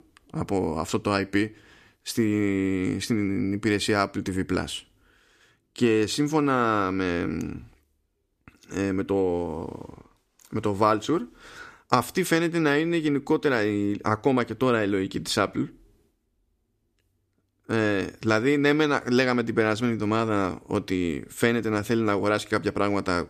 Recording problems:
none

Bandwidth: 14.5 kHz